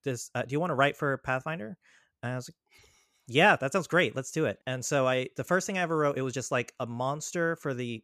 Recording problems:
none

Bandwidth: 14.5 kHz